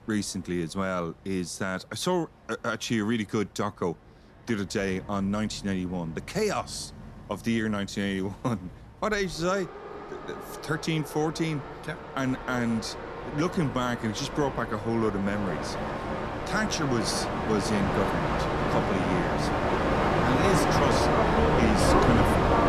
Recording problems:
train or aircraft noise; very loud; throughout; 2 dB above the speech

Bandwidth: 13.5 kHz